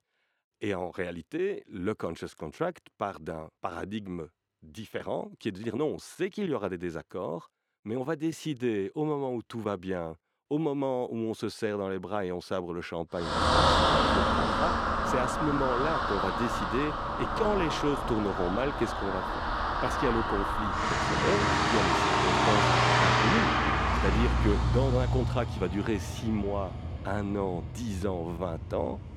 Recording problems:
traffic noise; very loud; from 13 s on; 5 dB above the speech

